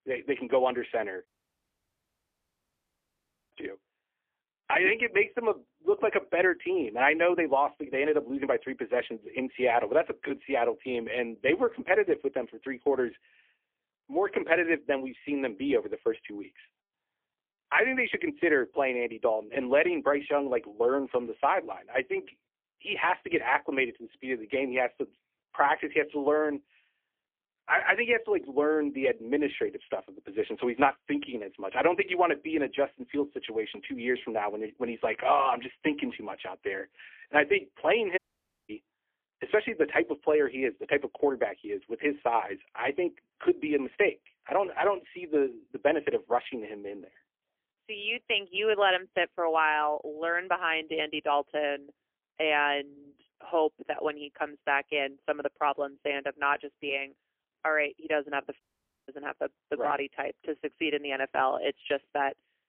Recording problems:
phone-call audio; poor line; nothing above 3 kHz
thin; somewhat; fading below 300 Hz
audio cutting out; at 1.5 s for 2.5 s, at 38 s for 0.5 s and at 59 s

